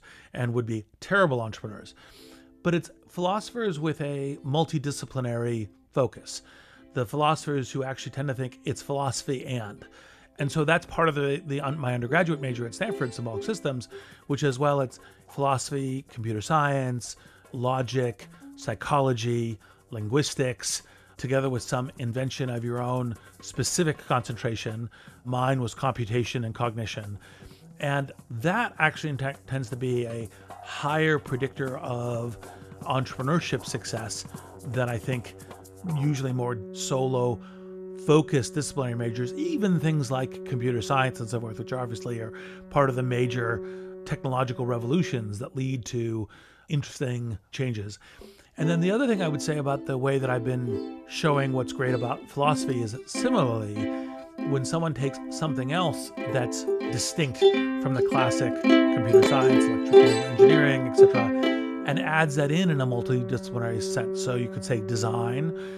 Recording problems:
background music; very loud; throughout; 1 dB above the speech

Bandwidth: 14.5 kHz